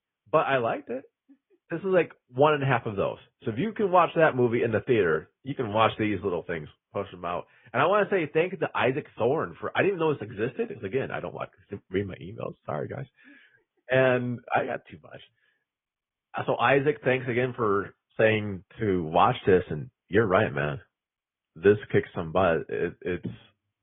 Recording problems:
high frequencies cut off; severe; nothing above 3.5 kHz
garbled, watery; slightly

